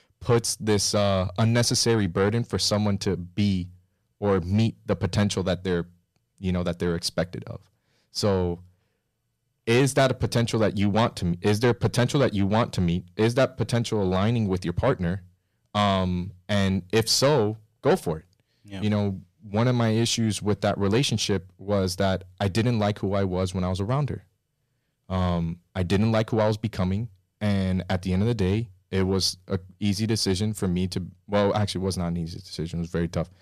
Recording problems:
distortion; slight; 10 dB below the speech

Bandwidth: 14.5 kHz